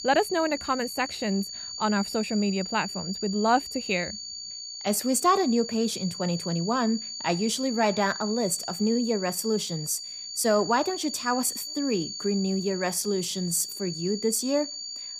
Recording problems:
high-pitched whine; loud; throughout; 4.5 kHz, 7 dB below the speech

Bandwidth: 15 kHz